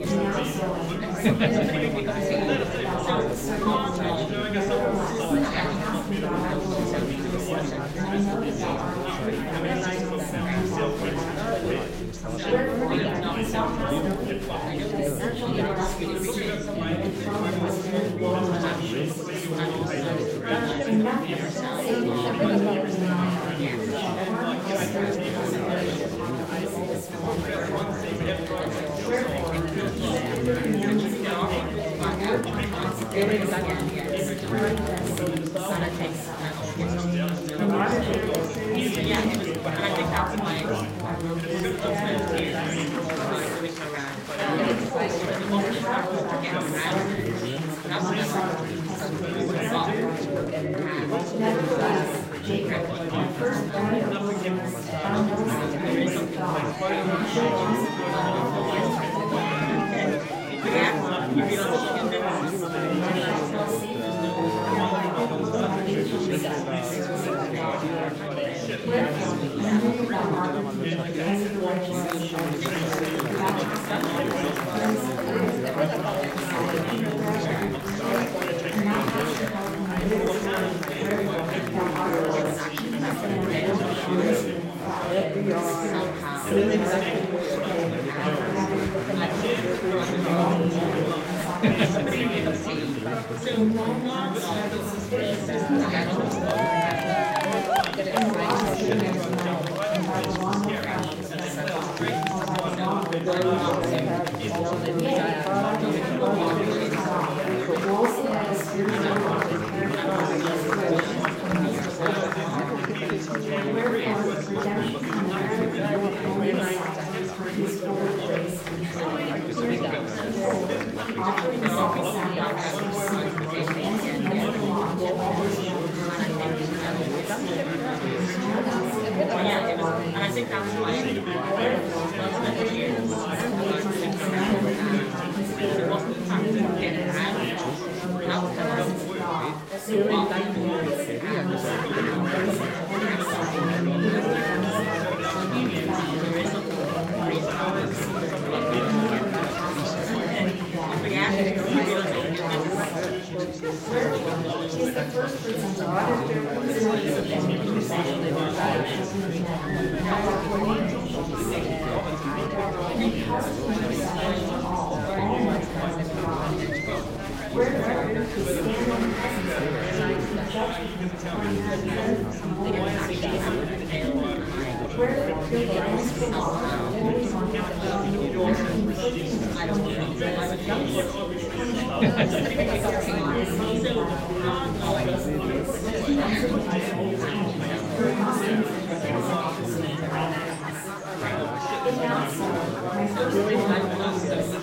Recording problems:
off-mic speech; far
room echo; noticeable; dies away in 0.5 s
chatter from many people; very loud; throughout; 3 dB above the speech
background music; noticeable; throughout; 15 dB below the speech

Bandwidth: 16 kHz